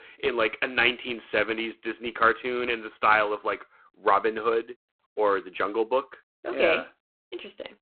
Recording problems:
phone-call audio; poor line

